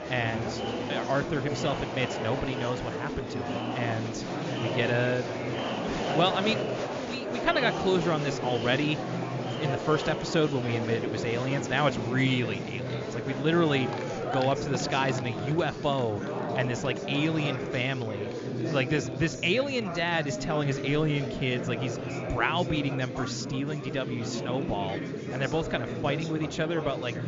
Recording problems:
high frequencies cut off; noticeable; nothing above 7 kHz
chatter from many people; loud; throughout; 4 dB below the speech

